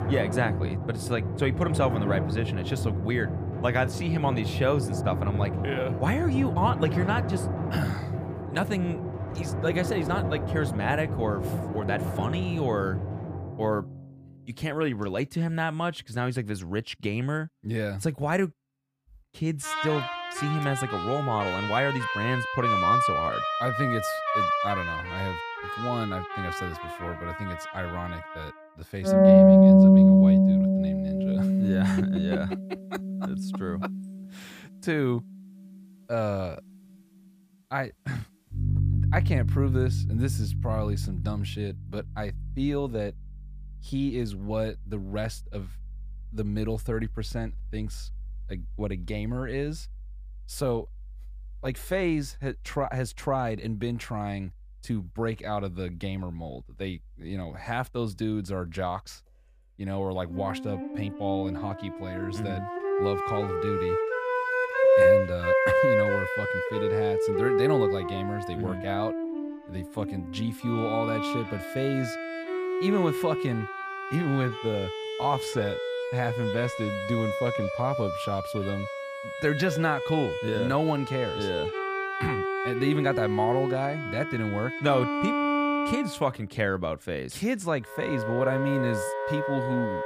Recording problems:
background music; very loud; throughout; 4 dB above the speech

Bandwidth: 15 kHz